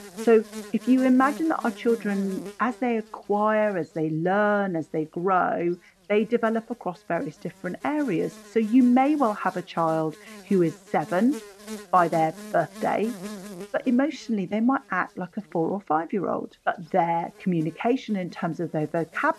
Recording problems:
muffled; very; fading above 1.5 kHz
electrical hum; noticeable; throughout; 50 Hz, 20 dB below the speech

